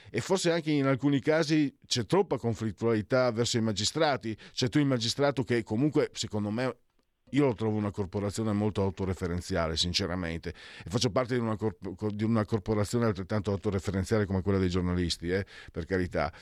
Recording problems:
none

